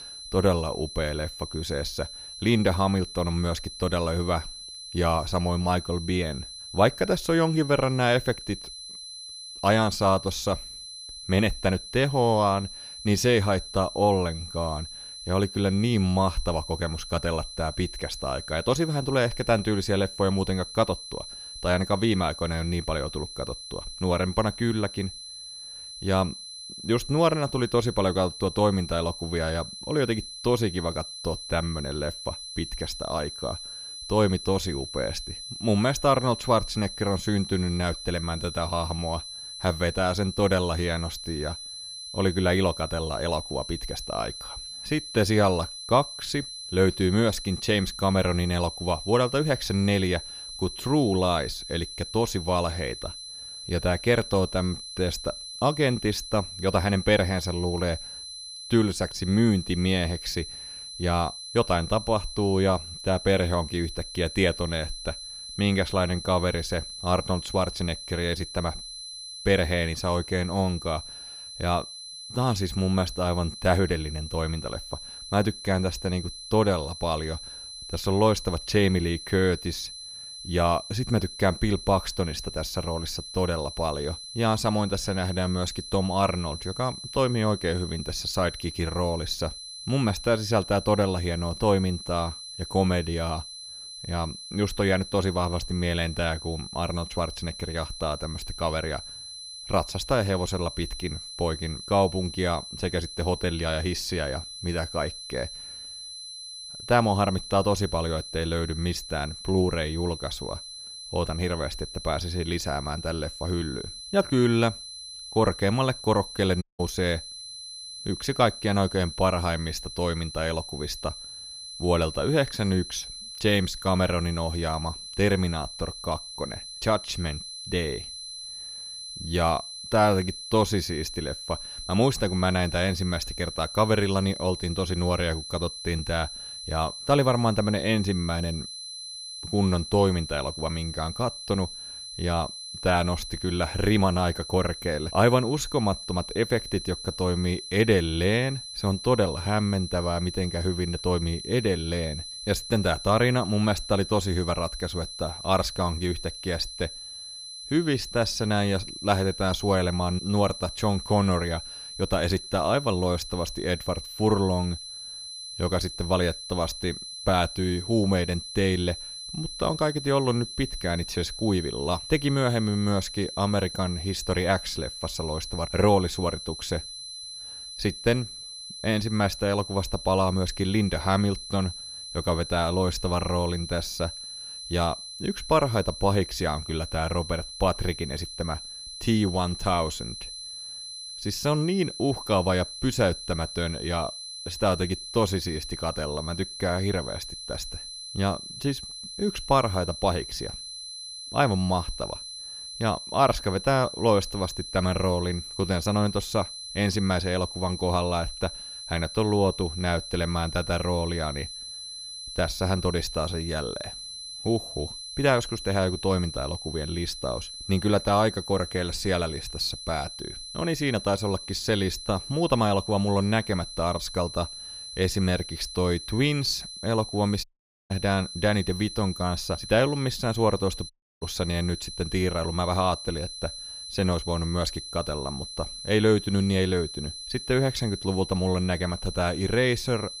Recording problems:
high-pitched whine; loud; throughout; 4 kHz, 10 dB below the speech
audio cutting out; at 1:57, at 3:47 and at 3:51

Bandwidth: 15 kHz